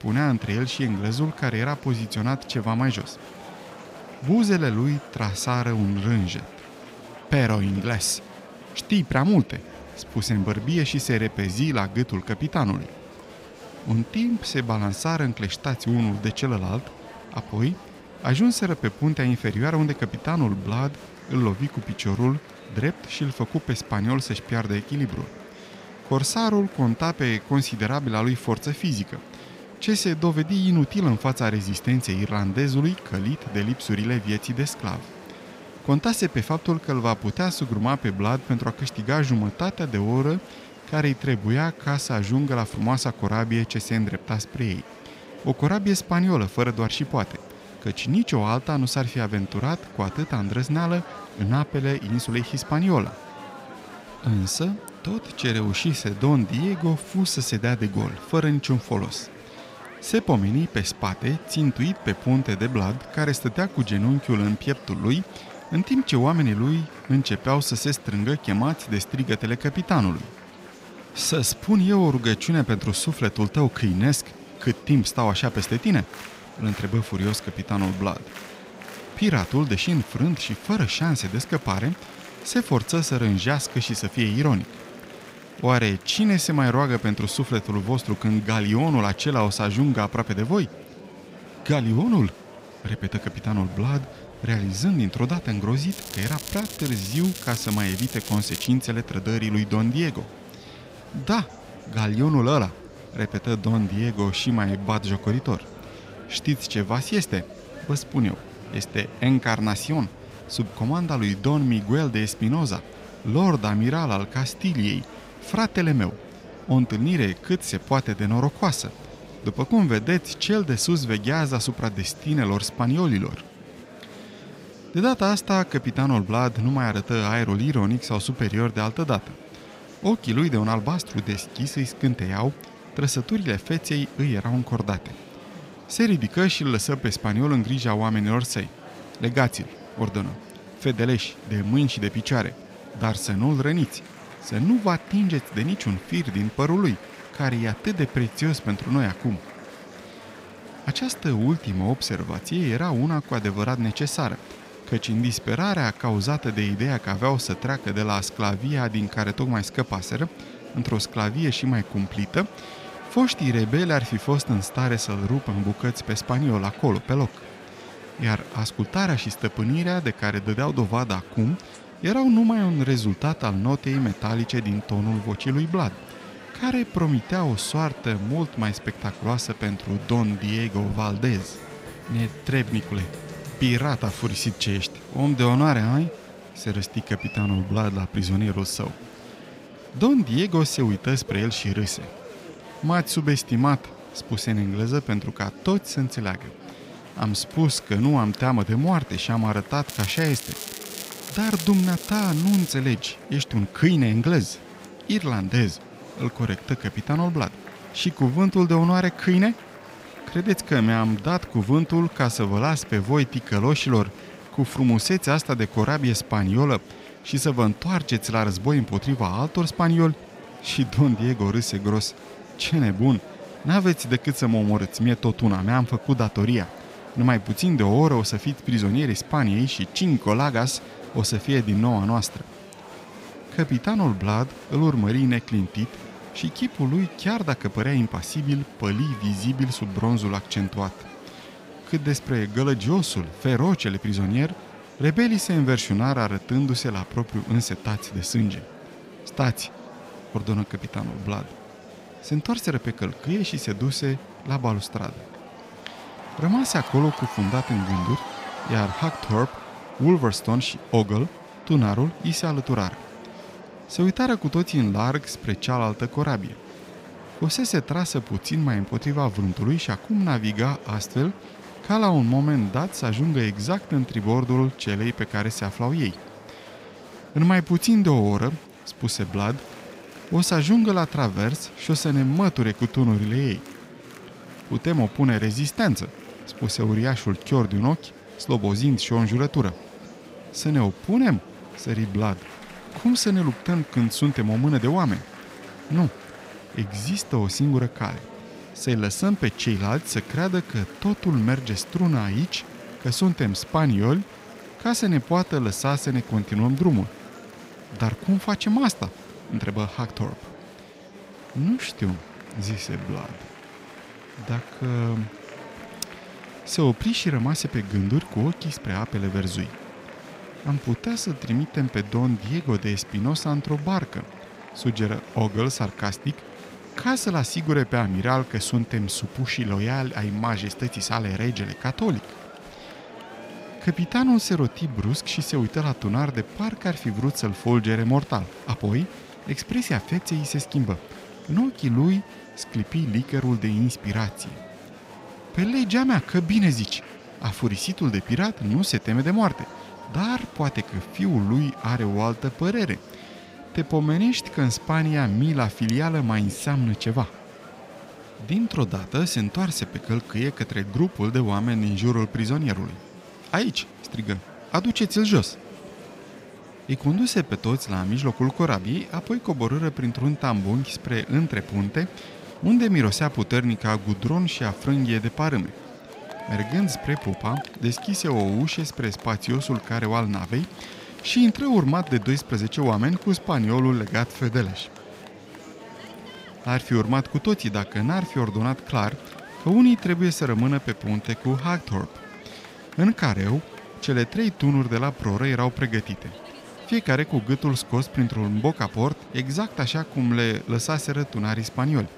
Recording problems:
murmuring crowd; noticeable; throughout; 20 dB below the speech
crackling; noticeable; from 1:36 to 1:39 and from 3:20 to 3:23; 10 dB below the speech

